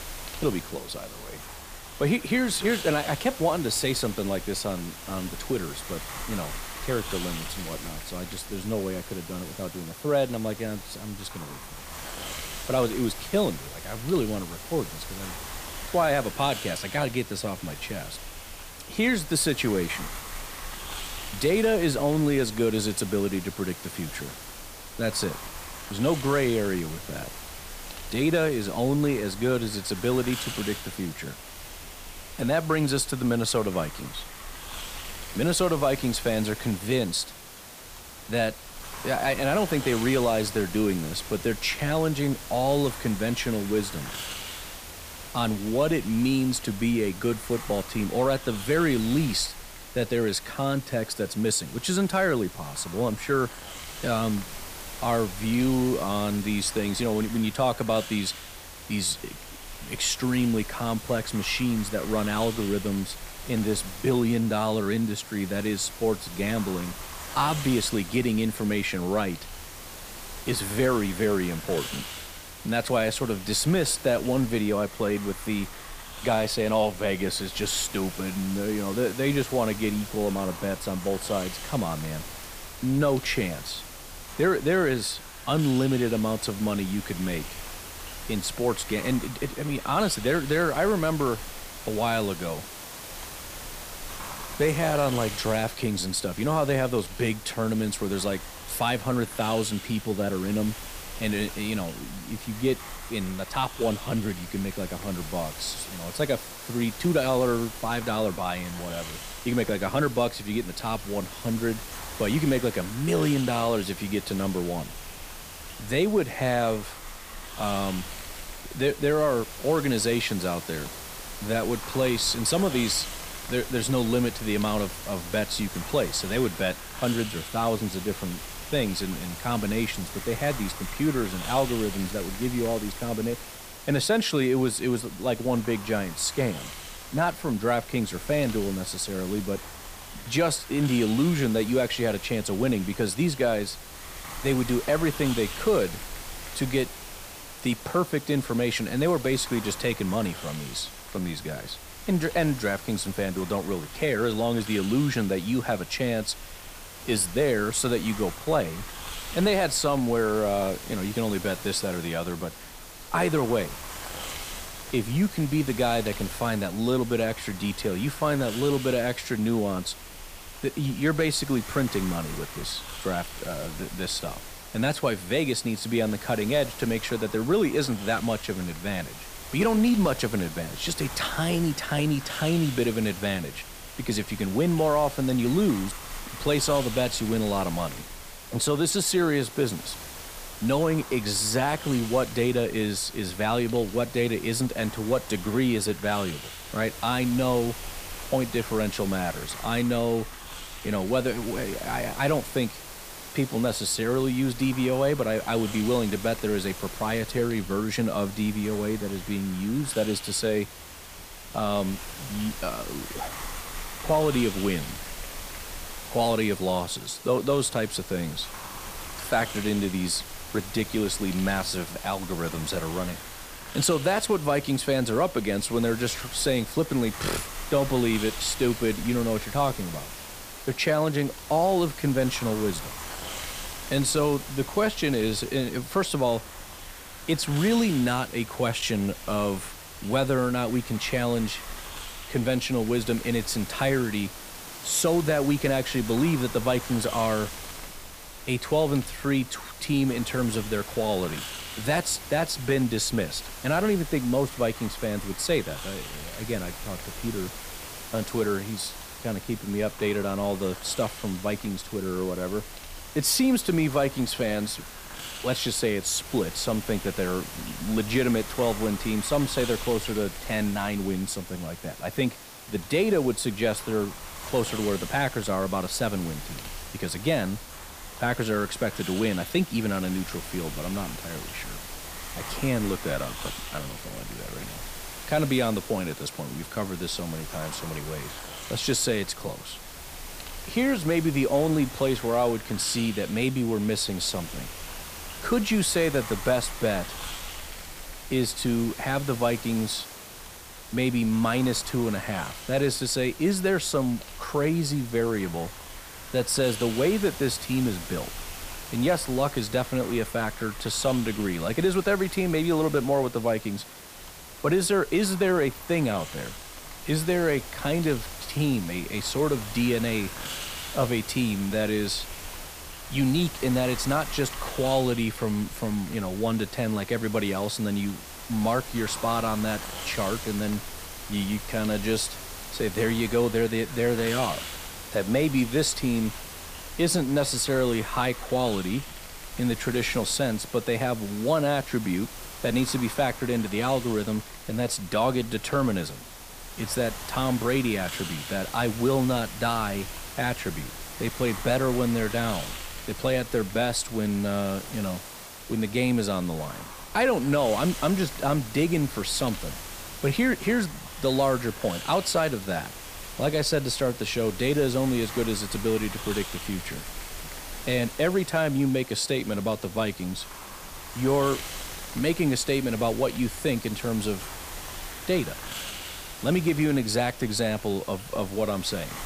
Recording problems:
hiss; noticeable; throughout; 10 dB below the speech

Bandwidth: 15 kHz